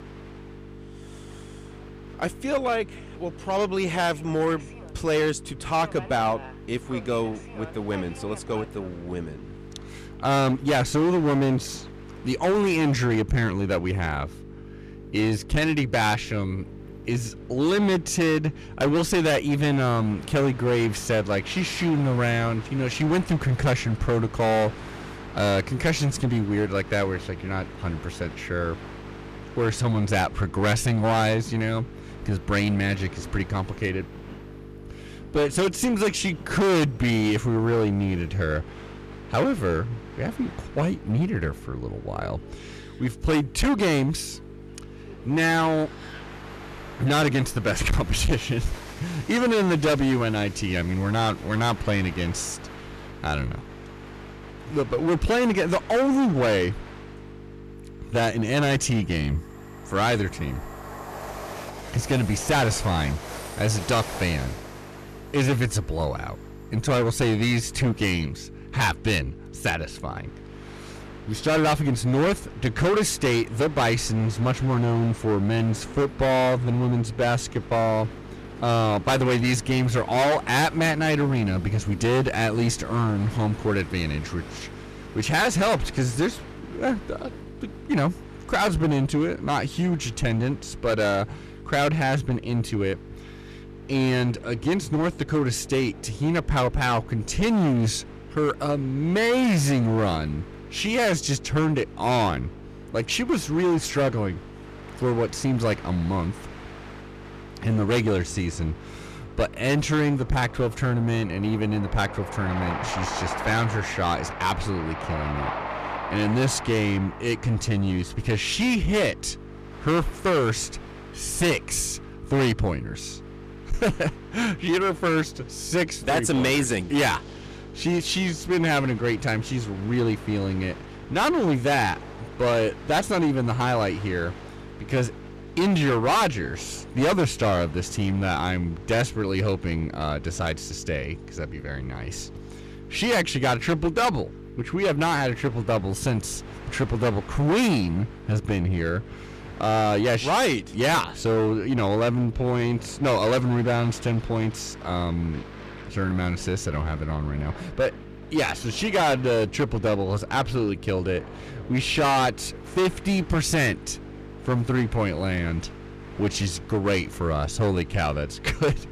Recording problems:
distortion; heavy; 12% of the sound clipped
train or aircraft noise; noticeable; throughout; 20 dB below the speech
electrical hum; faint; throughout; 50 Hz, 20 dB below the speech

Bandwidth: 14.5 kHz